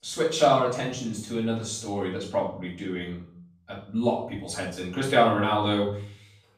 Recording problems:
off-mic speech; far
room echo; noticeable; dies away in 0.6 s

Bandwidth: 15 kHz